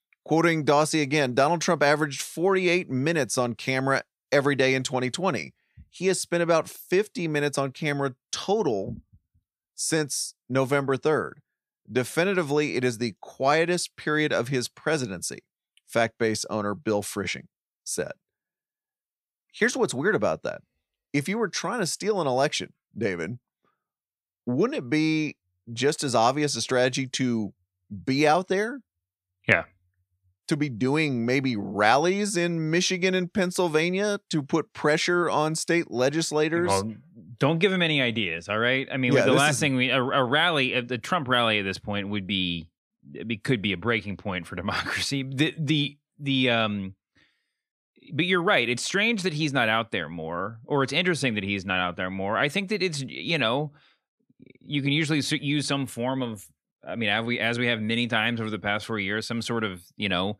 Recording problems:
none

